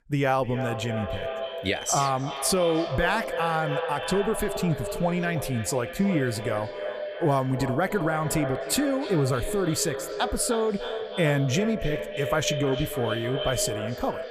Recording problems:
echo of what is said; strong; throughout; 300 ms later, 6 dB below the speech

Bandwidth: 14.5 kHz